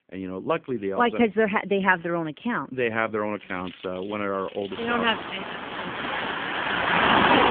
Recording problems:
phone-call audio
traffic noise; very loud; throughout; 2 dB above the speech

